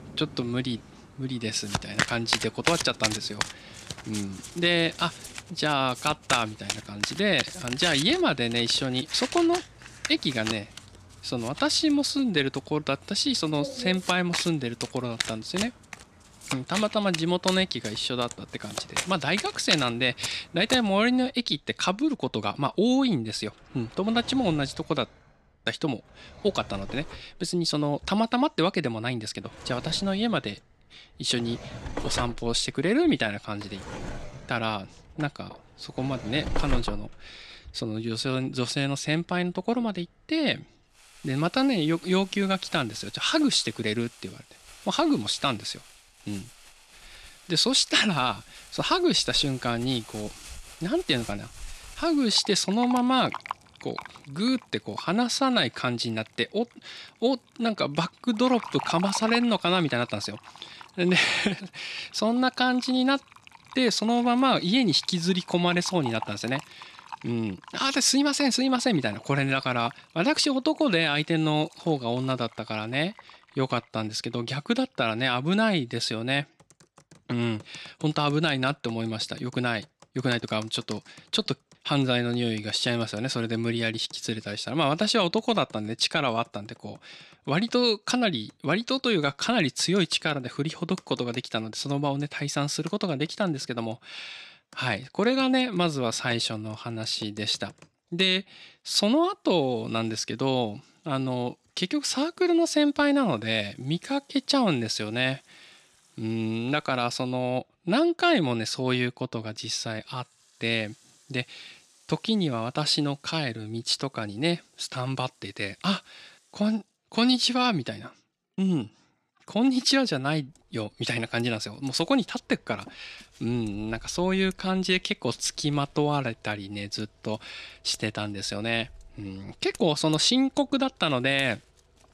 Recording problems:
household noises; noticeable; throughout; 10 dB below the speech

